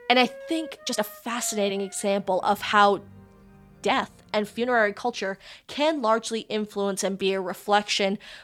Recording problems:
background music; faint; until 5 s; 20 dB below the speech
uneven, jittery; strongly; from 1 to 8 s

